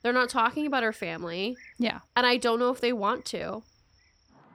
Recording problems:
animal sounds; faint; throughout; 30 dB below the speech

